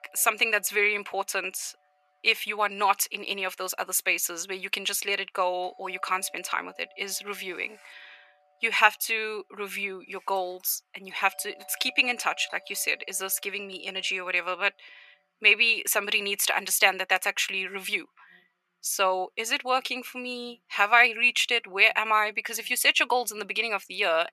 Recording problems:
thin; very; fading below 650 Hz
alarms or sirens; faint; throughout; 30 dB below the speech

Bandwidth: 13.5 kHz